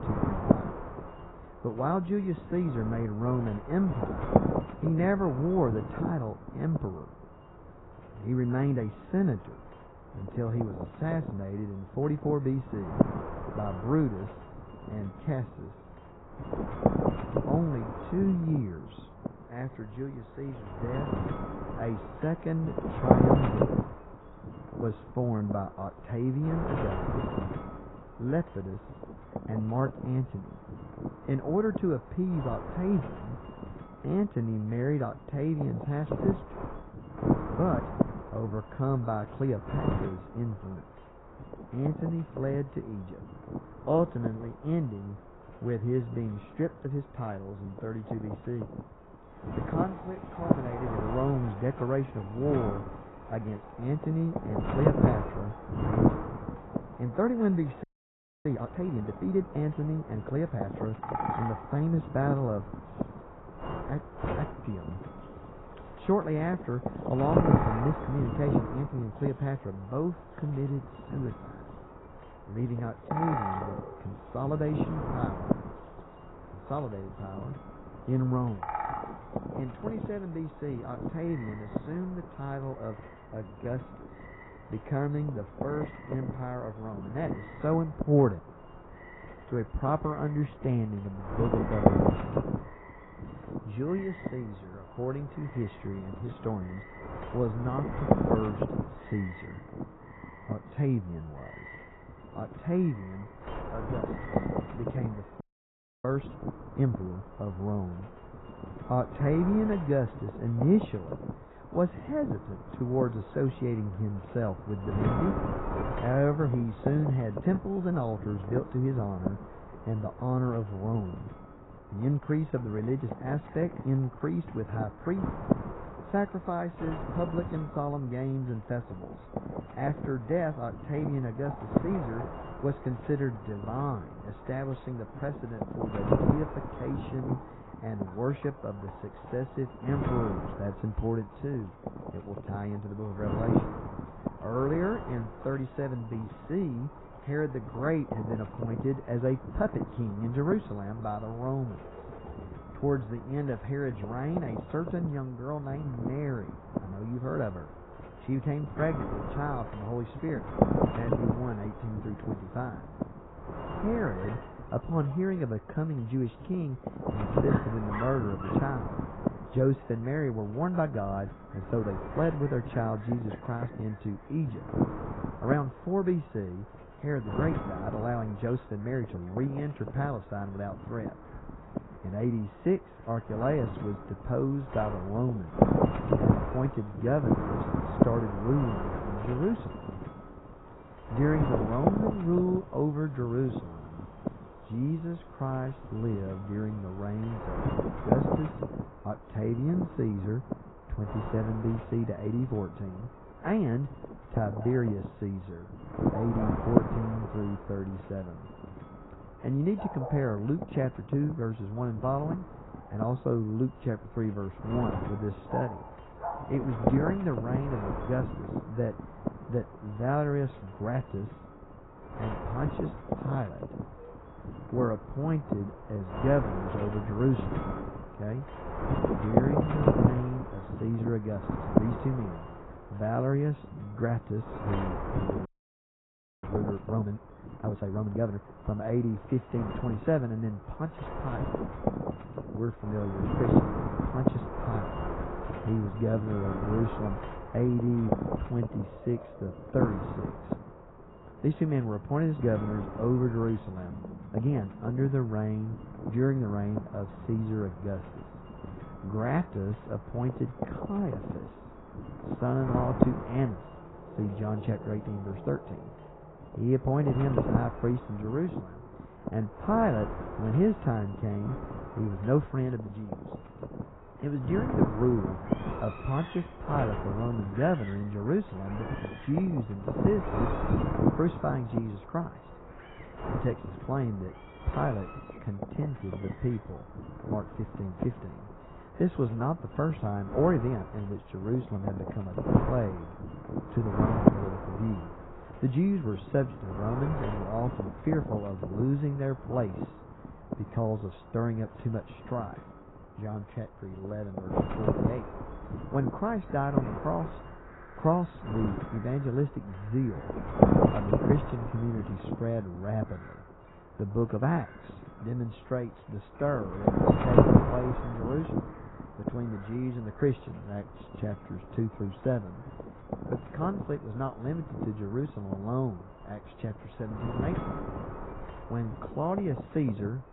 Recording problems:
garbled, watery; badly
muffled; very; fading above 2.5 kHz
wind noise on the microphone; heavy; 1 dB below the speech
animal sounds; noticeable; throughout; 15 dB below the speech
audio freezing; at 58 s for 0.5 s, at 1:45 for 0.5 s and at 3:55 for 1 s

